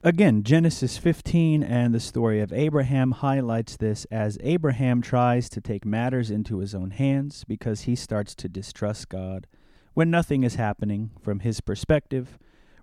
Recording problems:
none

